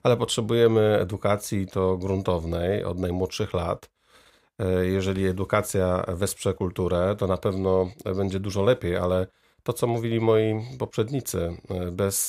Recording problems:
abrupt cut into speech; at the end

